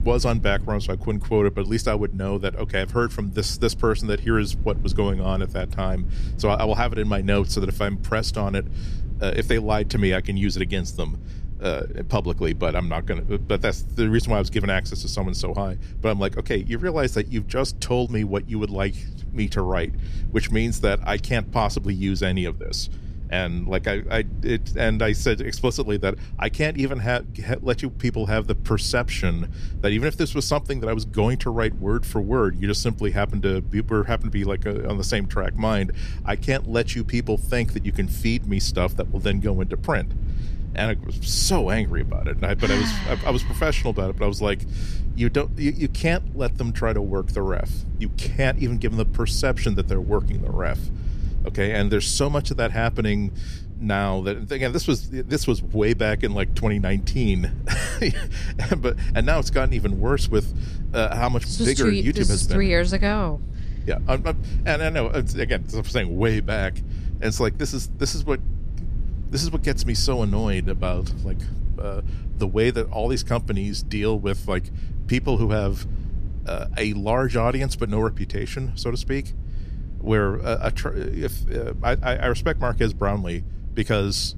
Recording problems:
low rumble; faint; throughout; 20 dB below the speech

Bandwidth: 14.5 kHz